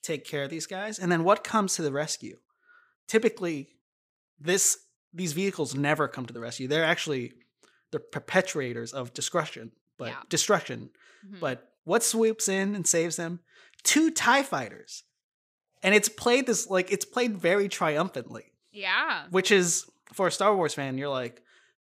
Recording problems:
none

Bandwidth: 15 kHz